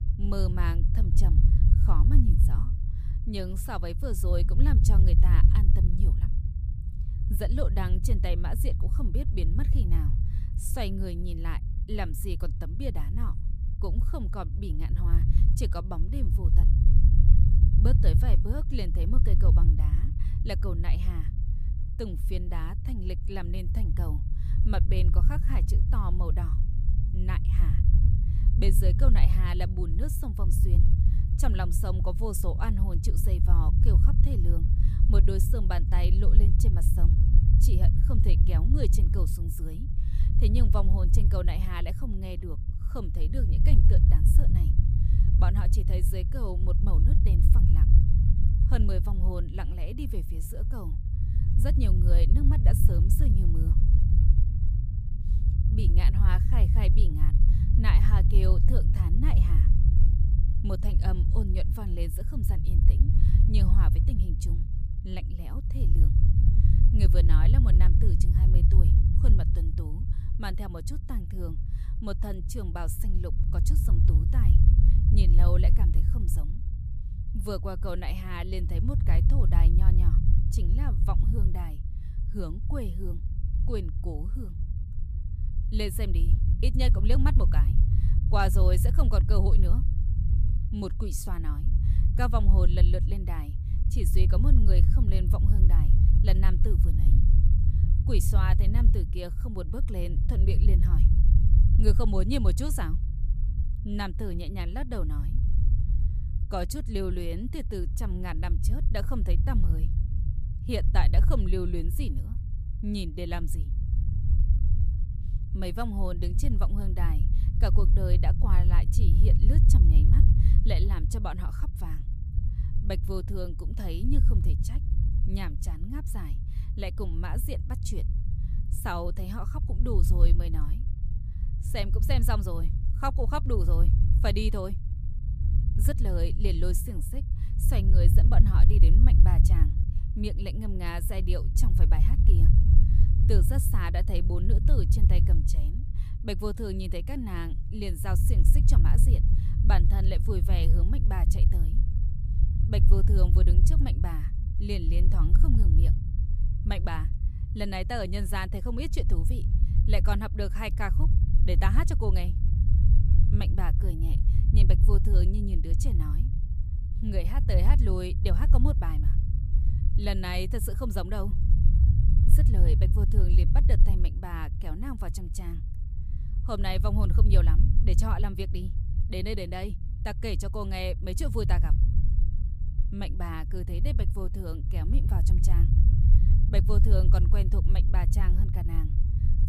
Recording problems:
low rumble; loud; throughout; 5 dB below the speech

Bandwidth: 15 kHz